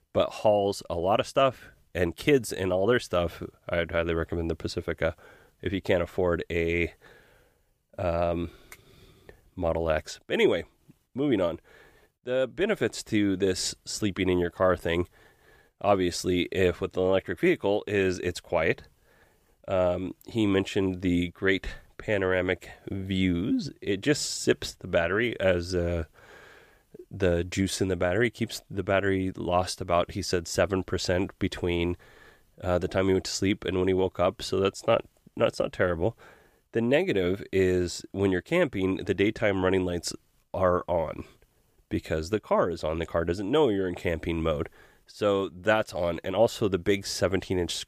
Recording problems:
none

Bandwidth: 15 kHz